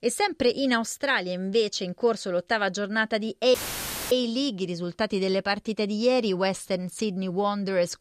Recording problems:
audio cutting out; filled with static; at 3.5 s for 0.5 s

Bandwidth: 14.5 kHz